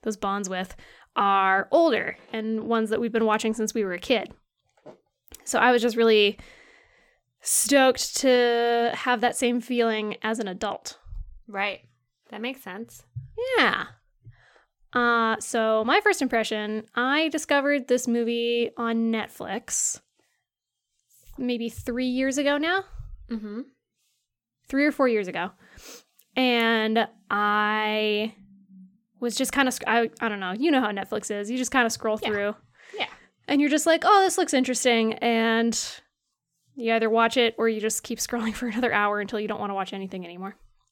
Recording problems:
none

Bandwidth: 17.5 kHz